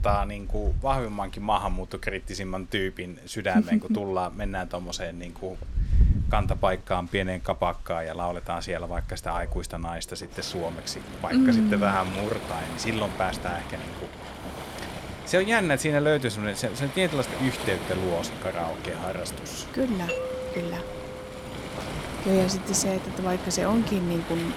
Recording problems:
rain or running water; loud; throughout; 7 dB below the speech
doorbell; noticeable; from 20 to 22 s; peak 3 dB below the speech

